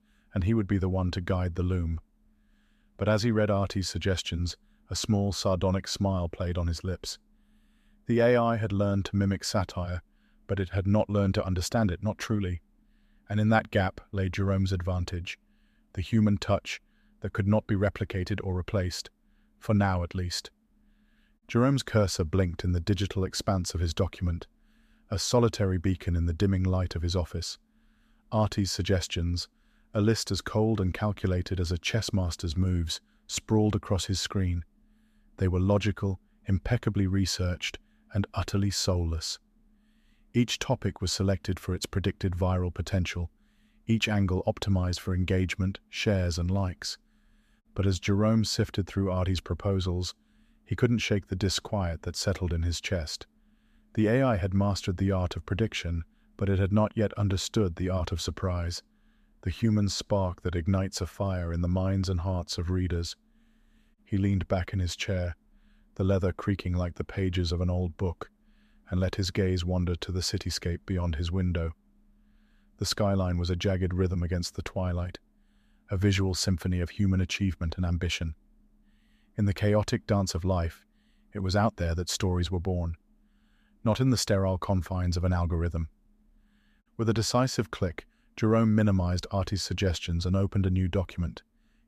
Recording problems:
none

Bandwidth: 14.5 kHz